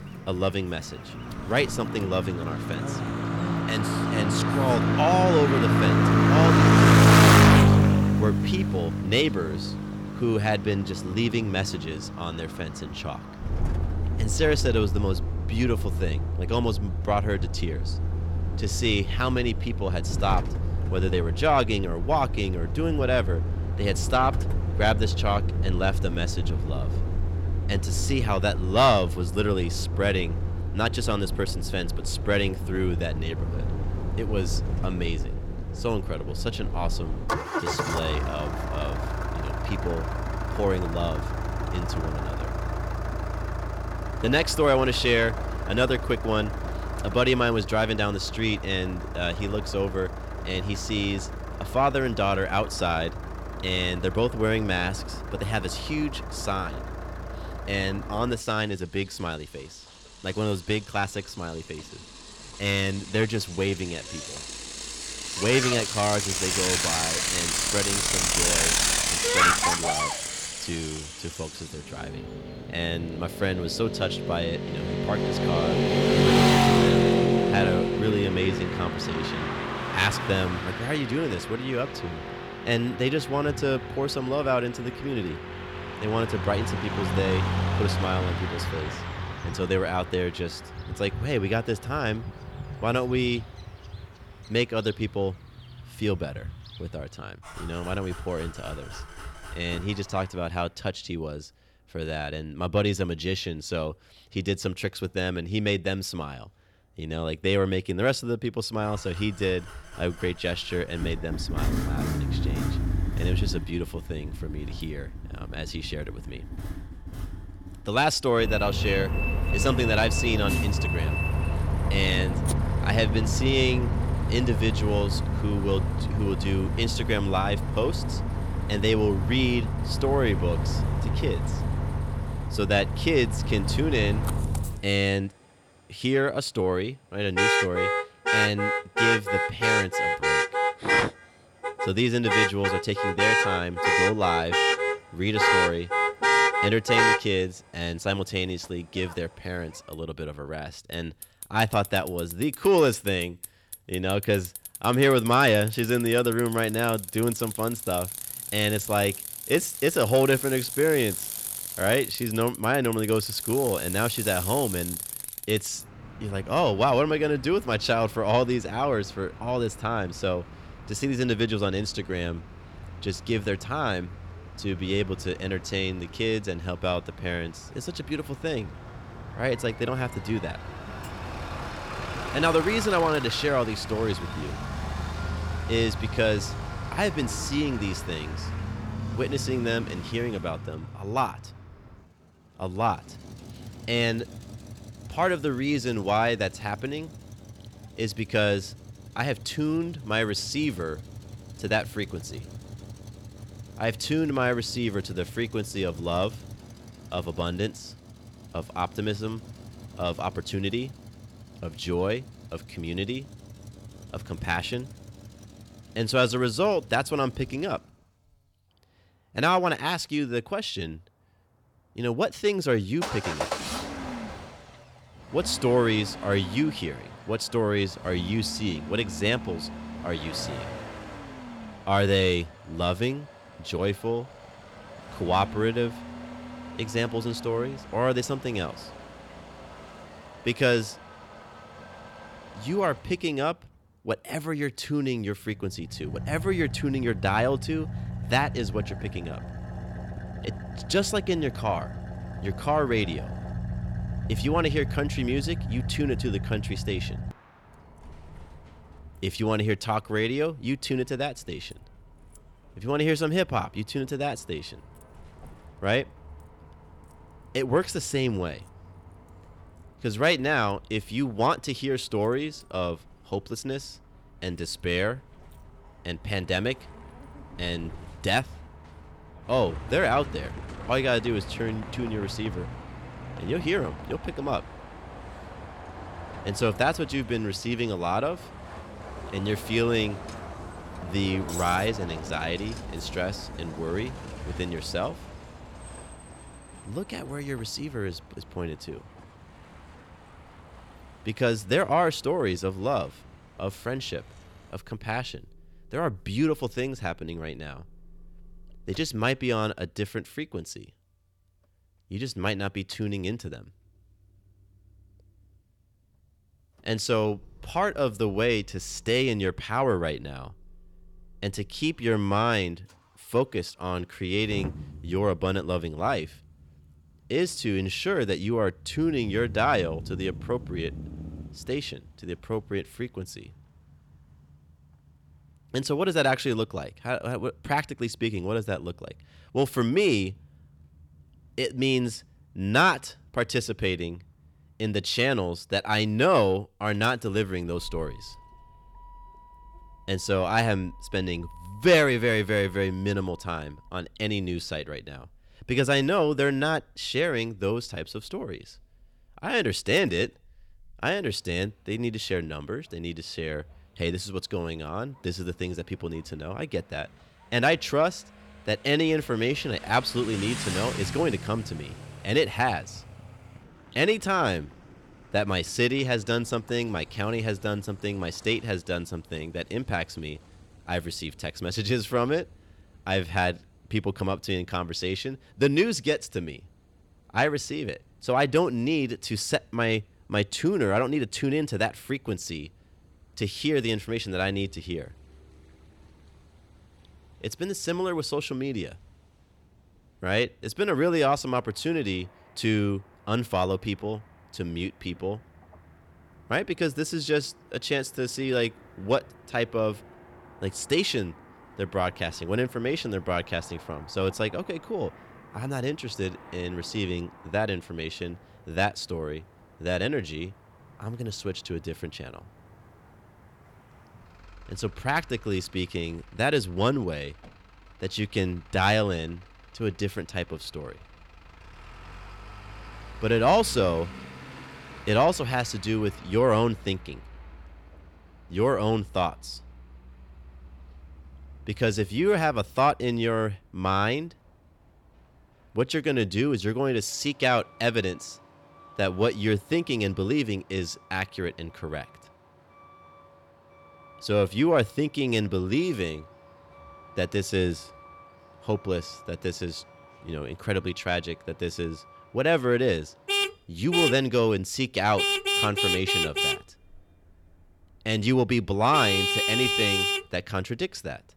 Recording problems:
distortion; heavy; 8 dB below the speech
traffic noise; loud; throughout; 1 dB below the speech

